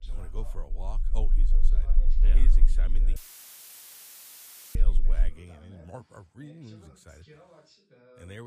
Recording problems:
low rumble; loud; until 5.5 s; 6 dB below the speech
voice in the background; noticeable; throughout; 10 dB below the speech
audio cutting out; filled with static; at 3 s for 1.5 s
abrupt cut into speech; at the end

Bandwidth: 15 kHz